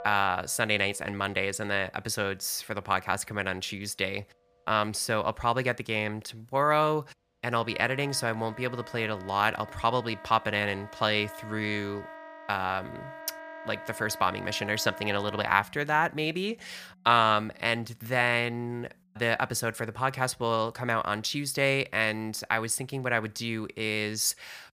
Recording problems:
background music; noticeable; throughout; 15 dB below the speech

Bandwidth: 15 kHz